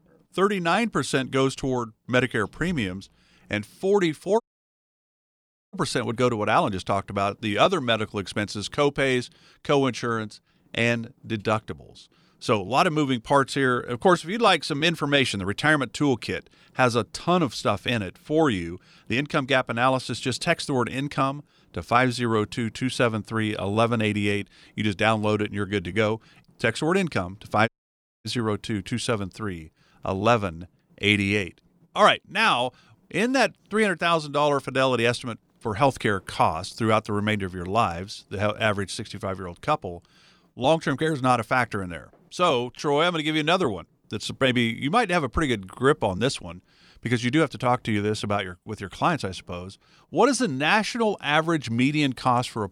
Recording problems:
audio cutting out; at 4.5 s for 1.5 s and at 28 s for 0.5 s

